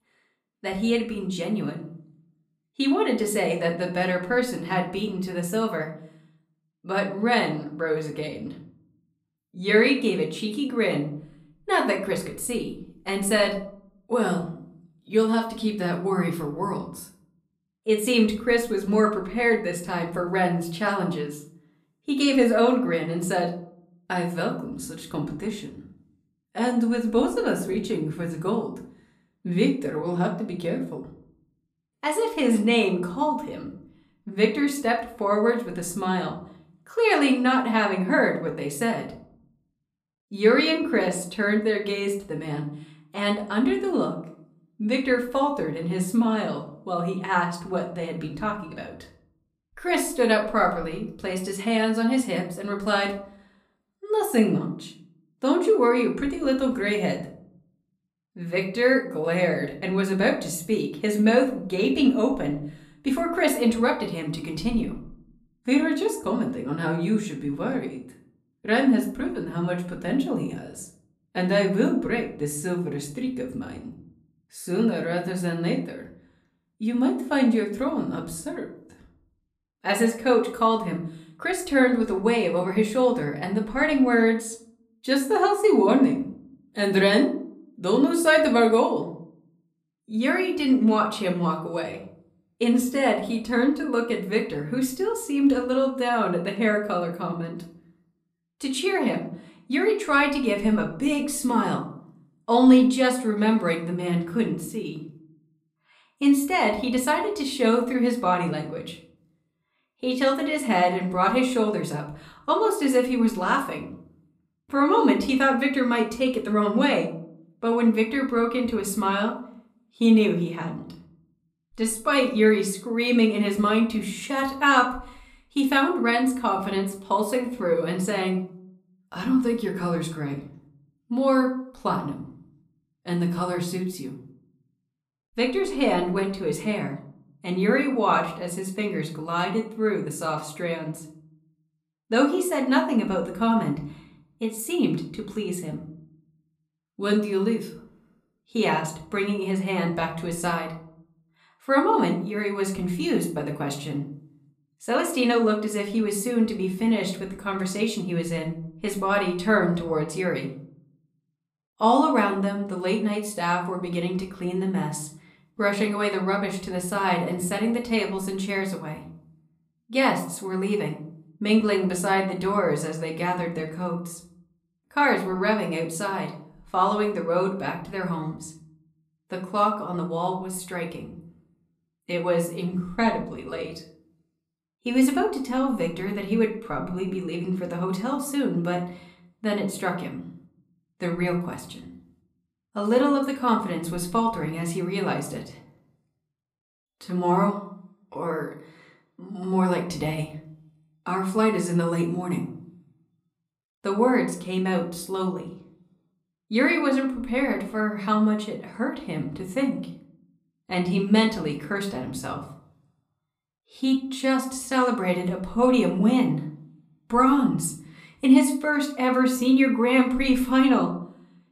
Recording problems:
room echo; slight; dies away in 0.5 s
off-mic speech; somewhat distant

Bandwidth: 14.5 kHz